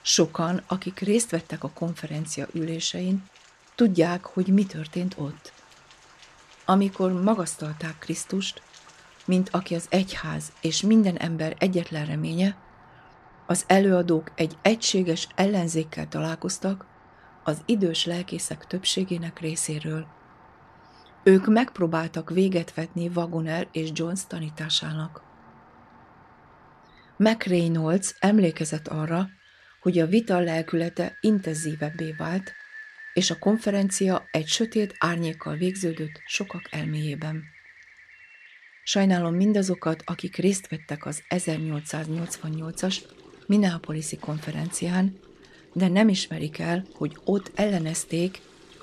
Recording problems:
rain or running water; faint; throughout; 25 dB below the speech

